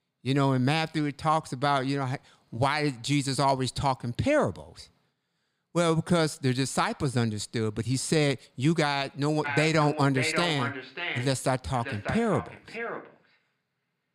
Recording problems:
echo of what is said; strong; from 9.5 s on; 590 ms later, 7 dB below the speech

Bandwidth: 15.5 kHz